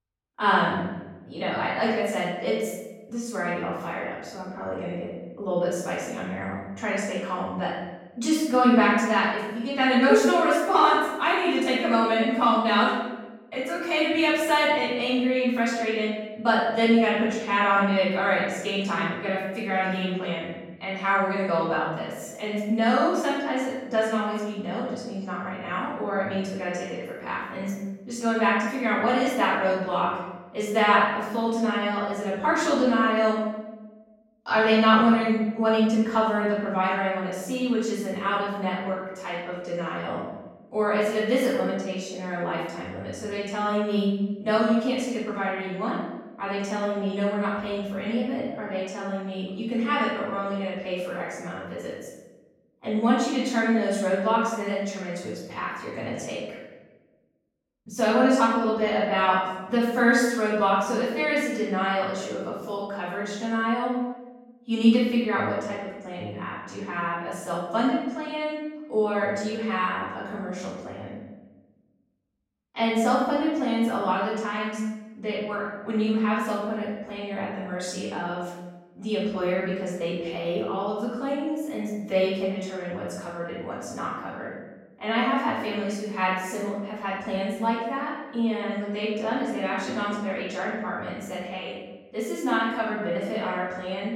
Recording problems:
off-mic speech; far
room echo; noticeable; dies away in 1 s

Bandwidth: 16.5 kHz